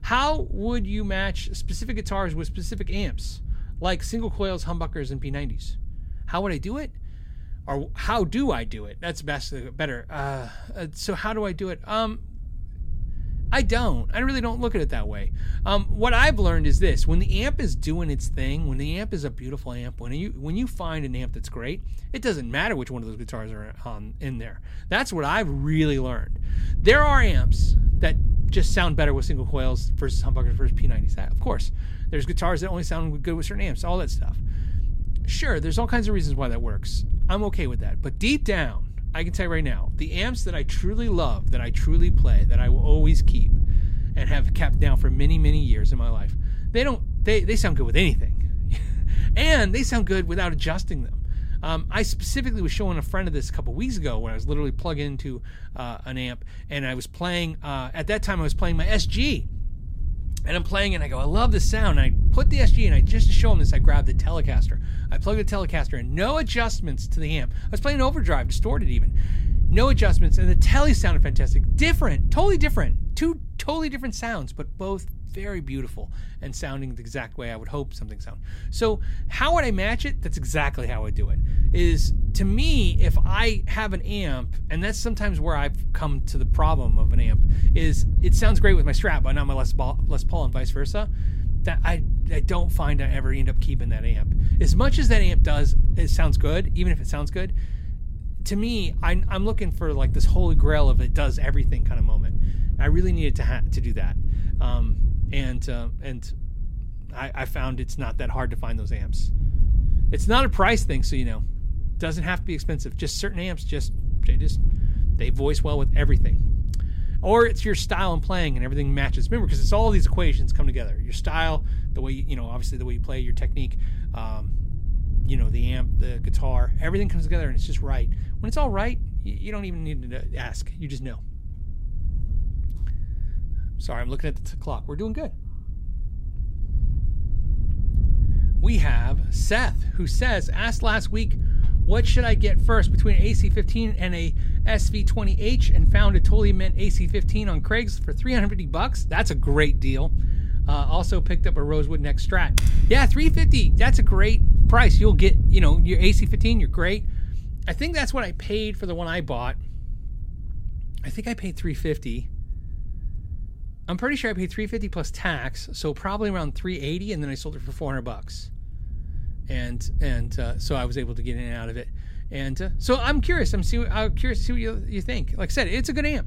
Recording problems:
wind noise on the microphone; occasional gusts; 15 dB below the speech
keyboard typing; noticeable; at 2:33; peak 2 dB below the speech

